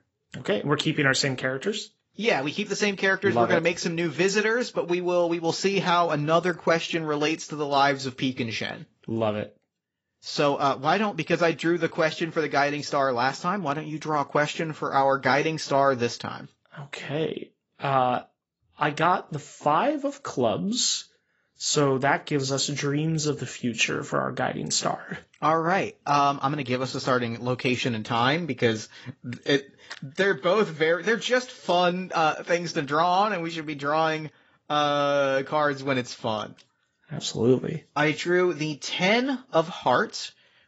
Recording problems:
garbled, watery; badly; nothing above 7.5 kHz

